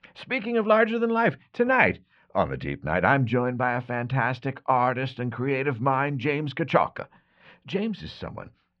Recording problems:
muffled; very; fading above 2.5 kHz

